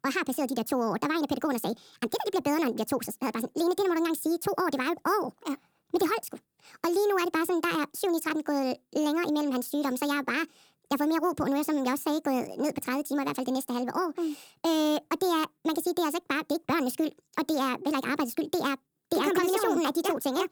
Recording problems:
wrong speed and pitch; too fast and too high; 1.5 times normal speed

